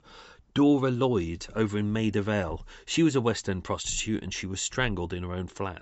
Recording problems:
high frequencies cut off; noticeable; nothing above 7.5 kHz

